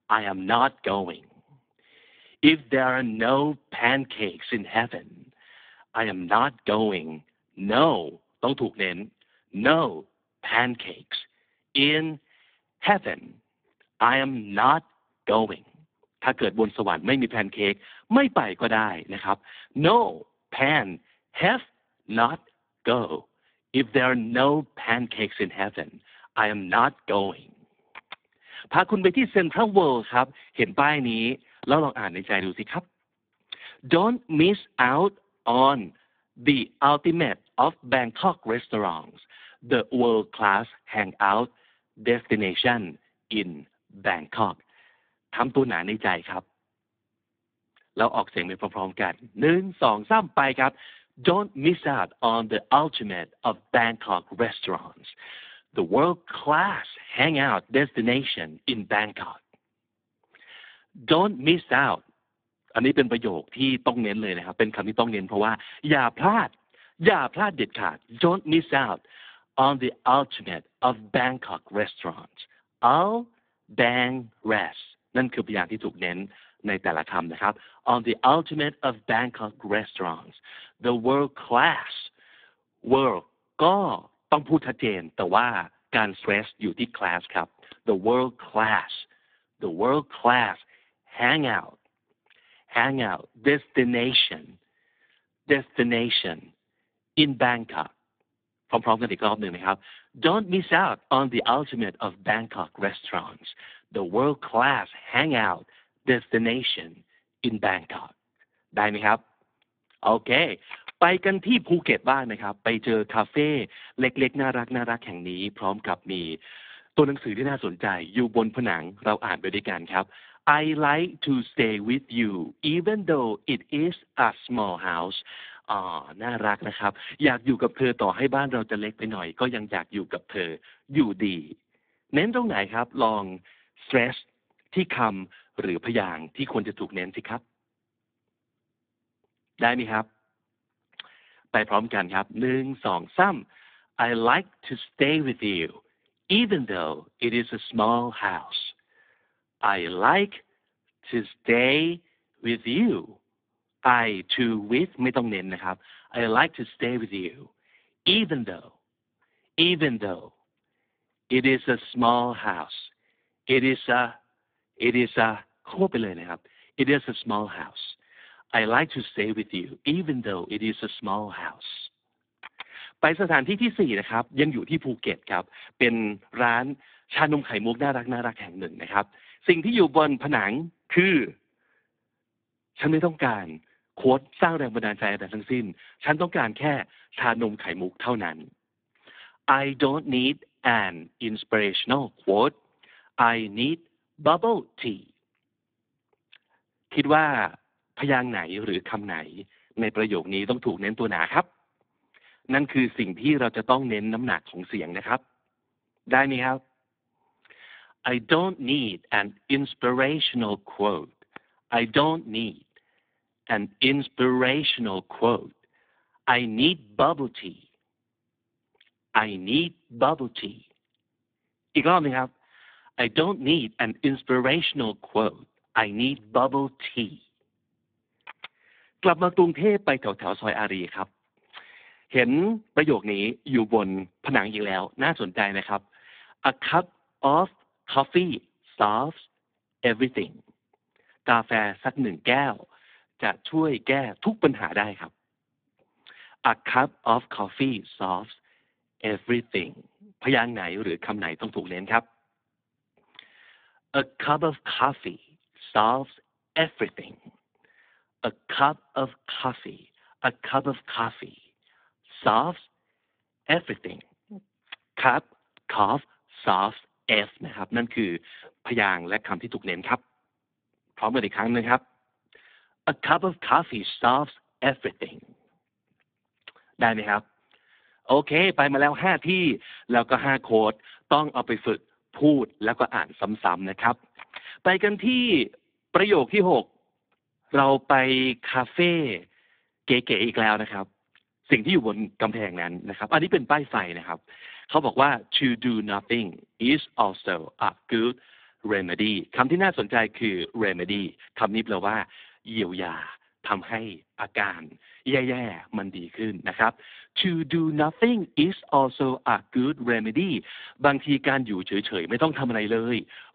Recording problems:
phone-call audio; poor line; nothing above 3.5 kHz

